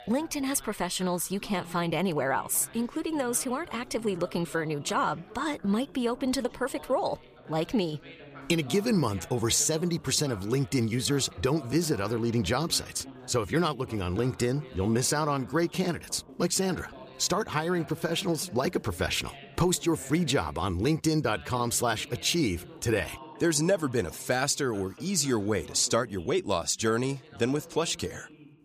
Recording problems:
background chatter; noticeable; throughout; 2 voices, 20 dB below the speech

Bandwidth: 15 kHz